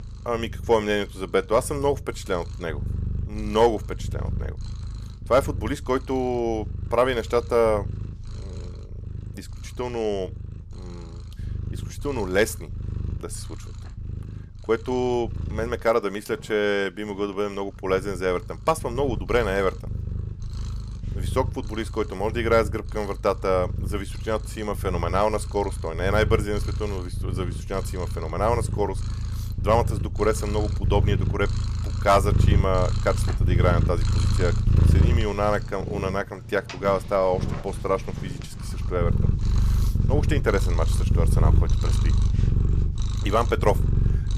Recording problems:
animal sounds; loud; throughout; 2 dB below the speech

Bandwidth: 14.5 kHz